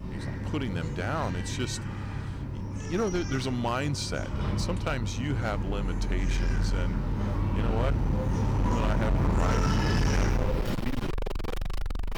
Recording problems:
distortion; heavy; 20% of the sound clipped
animal sounds; very loud; throughout; 3 dB above the speech

